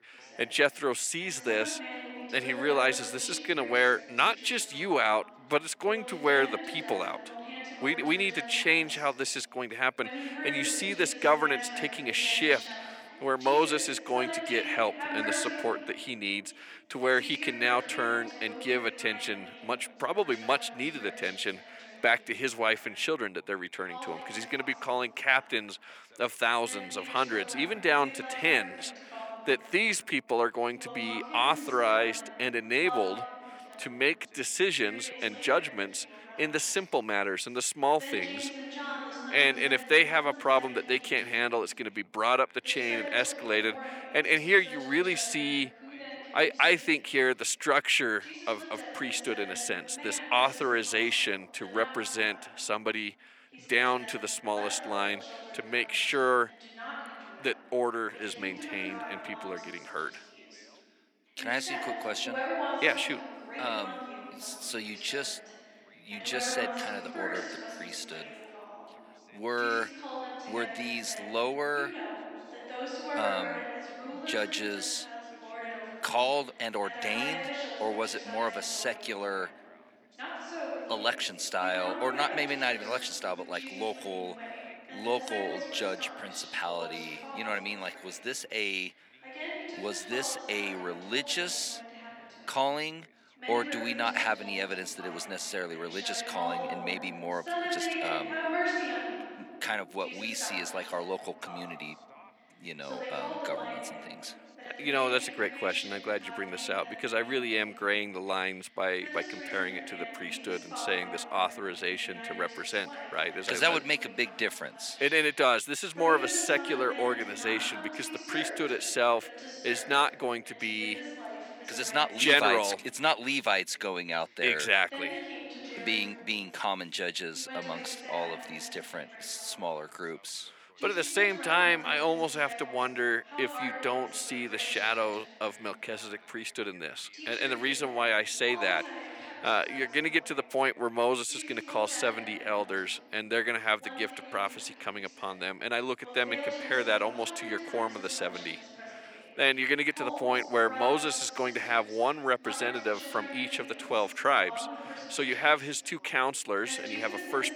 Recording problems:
thin; somewhat; fading below 400 Hz
background chatter; noticeable; throughout; 2 voices, 10 dB below the speech

